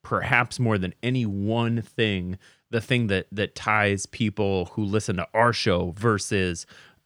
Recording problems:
none

